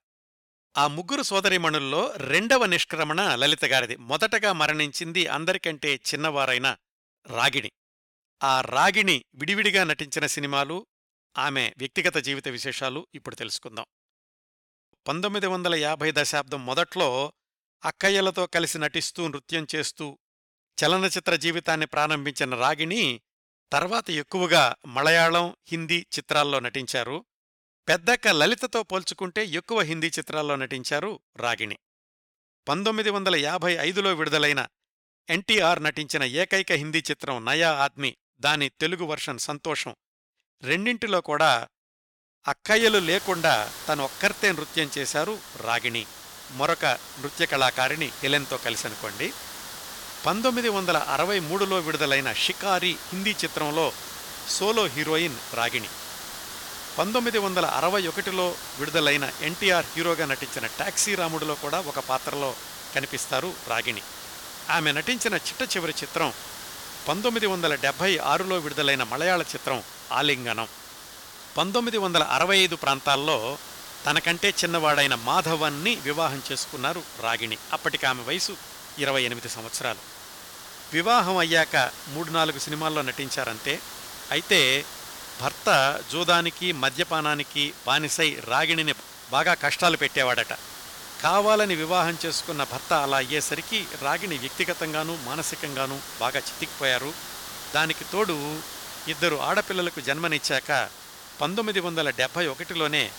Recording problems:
hiss; noticeable; from 43 s on; 15 dB below the speech

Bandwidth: 17.5 kHz